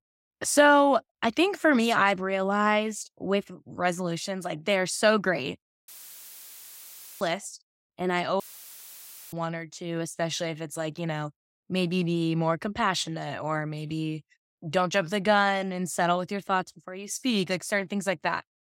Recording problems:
audio cutting out; filled with static; at 6 s for 1.5 s and at 8.5 s for 1 s

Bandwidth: 16 kHz